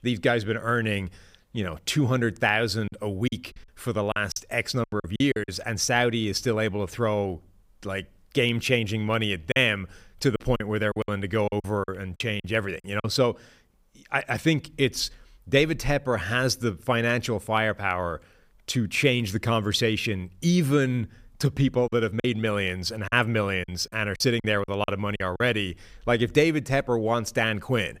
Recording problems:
choppy; very; from 3 to 5.5 s, from 9.5 to 13 s and from 22 to 25 s; 13% of the speech affected

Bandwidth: 15.5 kHz